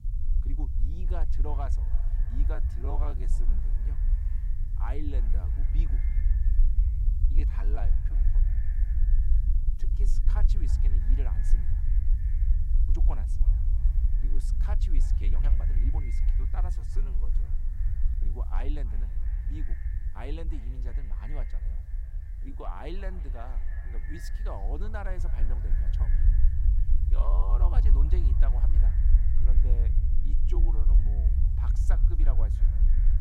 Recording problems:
echo of what is said; noticeable; throughout; 320 ms later, 15 dB below the speech
low rumble; loud; throughout; 5 dB below the speech
hiss; faint; throughout; 25 dB below the speech
uneven, jittery; strongly; from 2.5 to 31 s

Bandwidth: 16 kHz